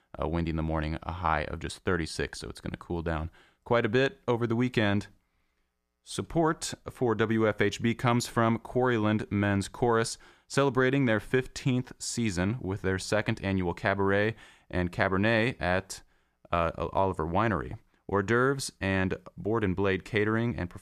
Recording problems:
none

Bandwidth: 14.5 kHz